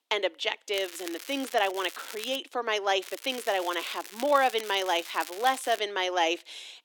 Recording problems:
thin; very slightly; fading below 300 Hz
crackling; noticeable; from 0.5 to 2.5 s and from 3 to 6 s; 15 dB below the speech

